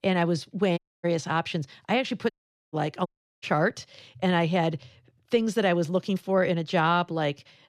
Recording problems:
audio cutting out; at 1 s, at 2.5 s and at 3 s

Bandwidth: 14 kHz